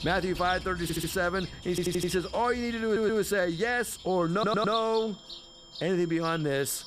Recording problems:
animal sounds; noticeable; throughout; 15 dB below the speech
high-pitched whine; faint; throughout; 3 kHz, 20 dB below the speech
audio stuttering; 4 times, first at 1 s

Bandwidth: 15 kHz